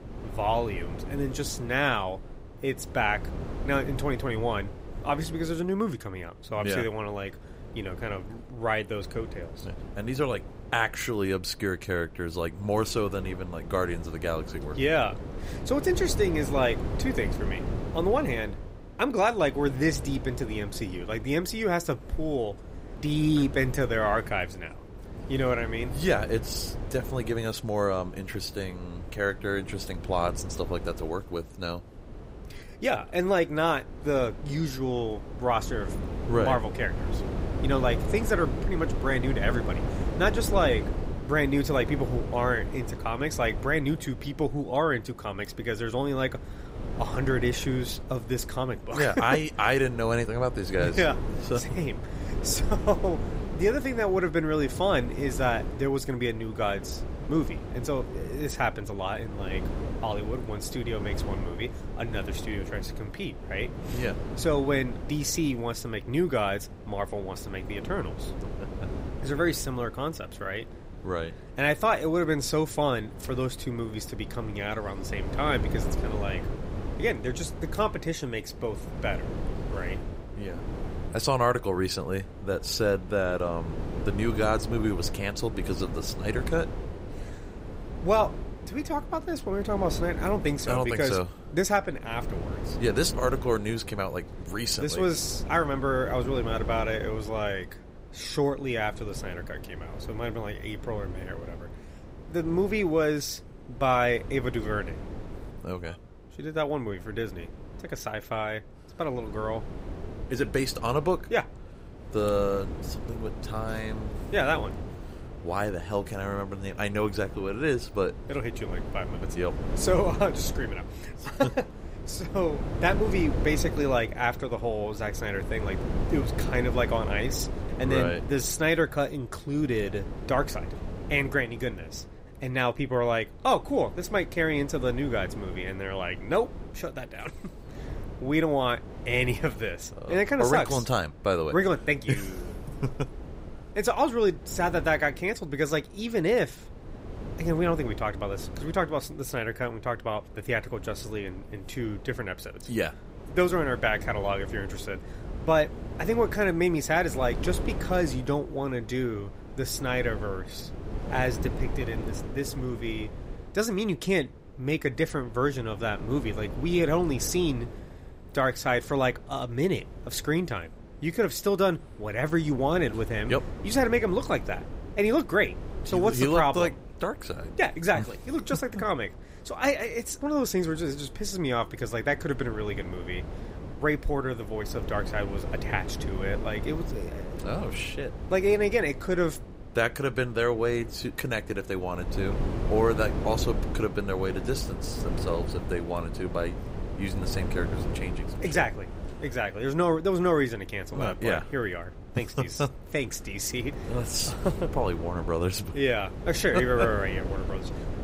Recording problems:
wind noise on the microphone; occasional gusts; 15 dB below the speech

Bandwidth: 15.5 kHz